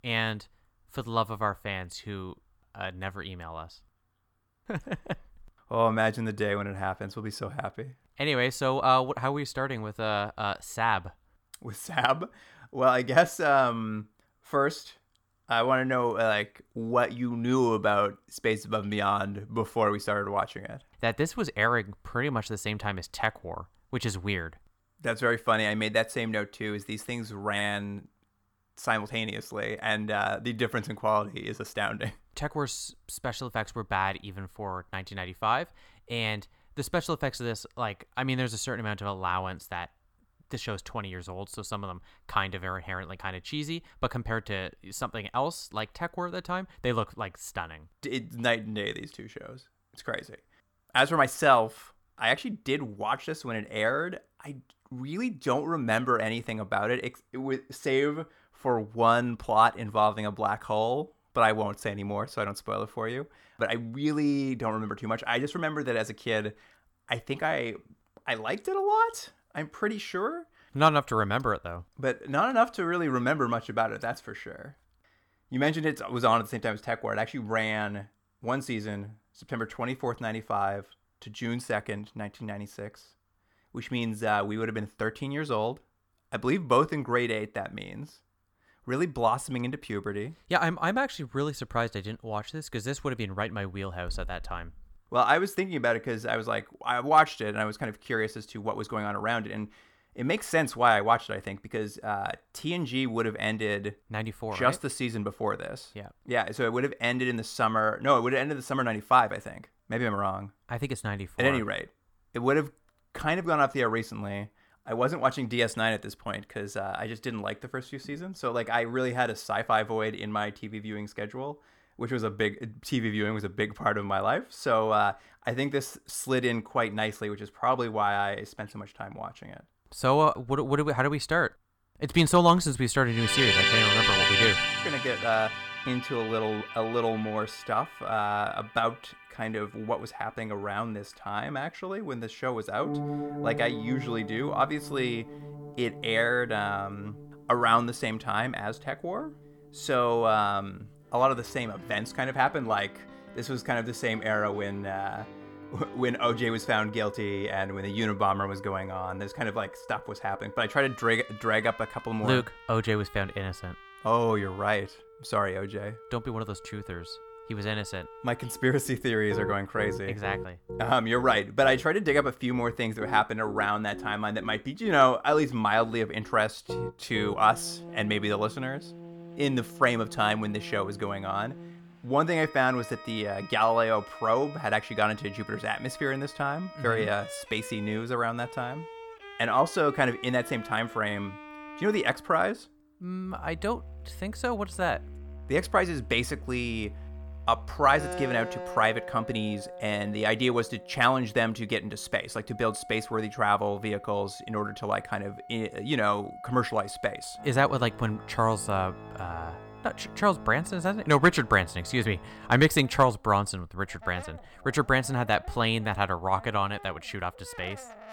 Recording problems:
background music; loud; from 2:13 on; 6 dB below the speech

